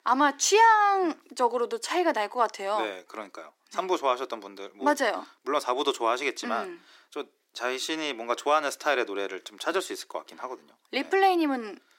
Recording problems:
thin; somewhat; fading below 350 Hz

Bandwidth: 16 kHz